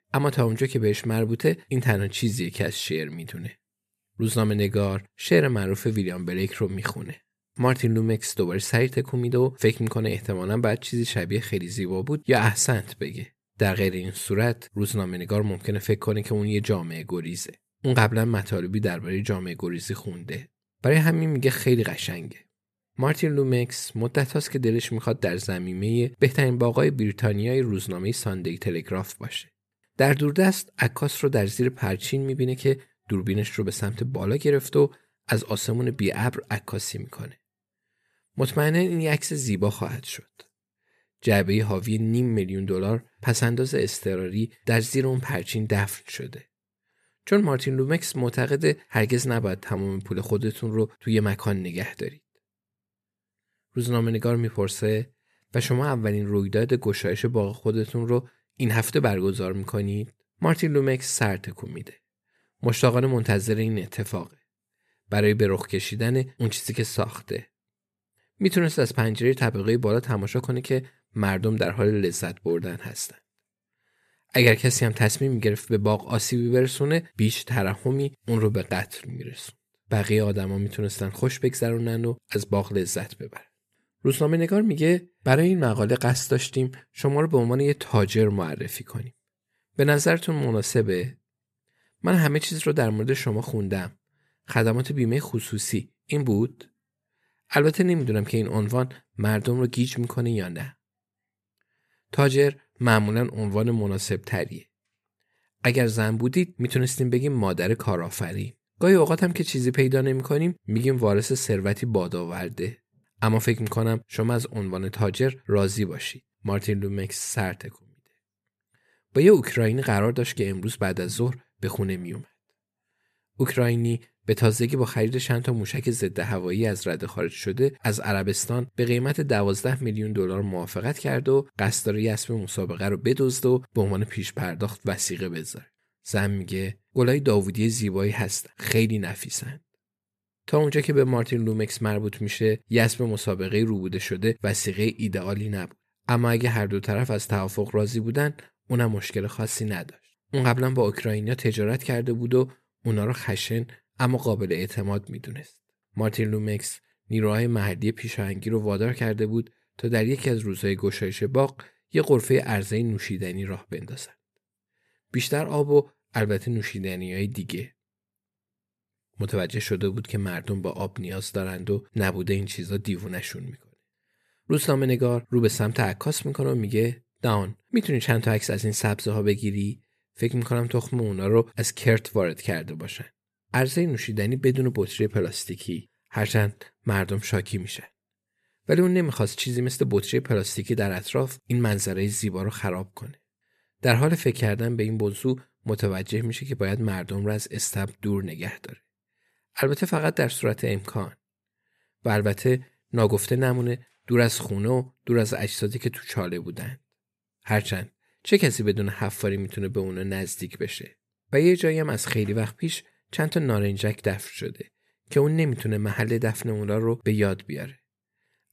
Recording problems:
none

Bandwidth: 14.5 kHz